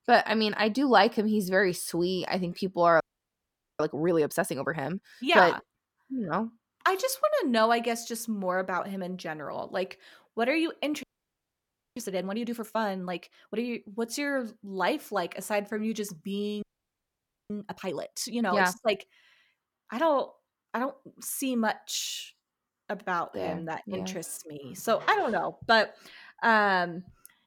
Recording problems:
audio freezing; at 3 s for 1 s, at 11 s for 1 s and at 17 s for 1 s

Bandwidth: 17.5 kHz